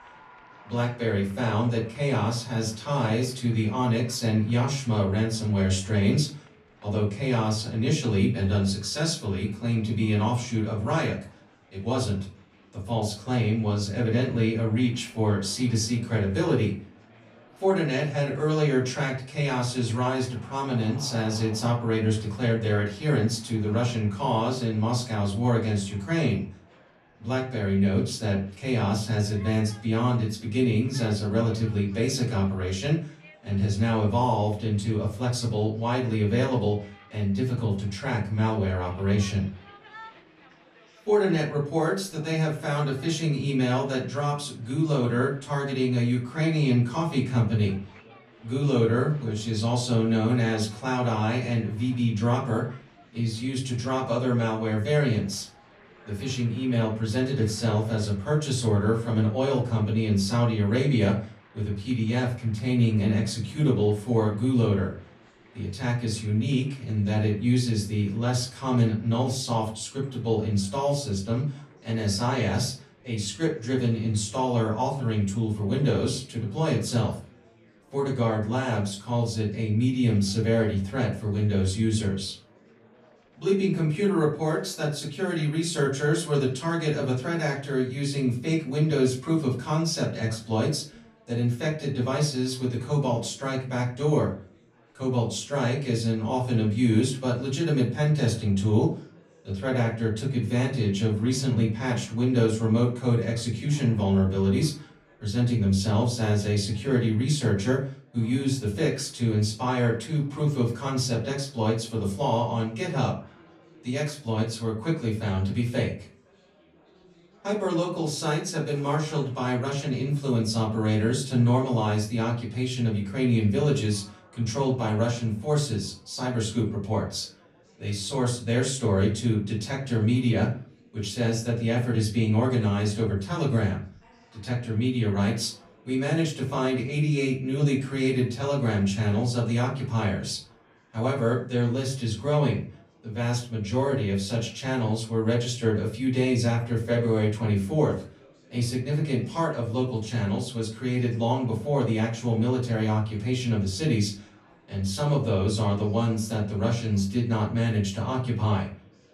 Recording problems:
off-mic speech; far
room echo; slight; dies away in 0.4 s
chatter from many people; faint; throughout; 30 dB below the speech

